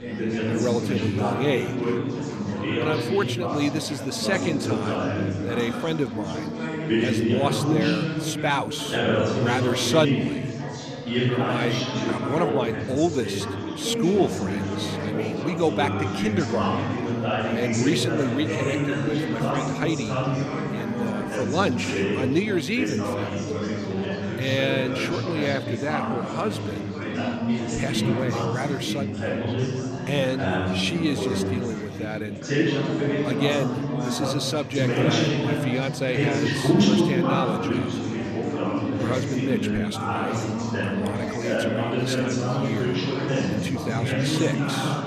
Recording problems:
chatter from many people; very loud; throughout; 2 dB above the speech

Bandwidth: 14.5 kHz